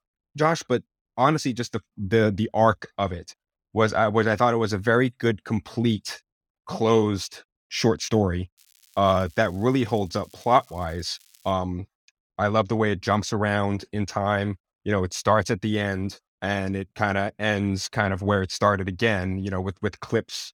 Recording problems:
crackling; faint; from 8.5 to 12 s; 30 dB below the speech

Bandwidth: 17.5 kHz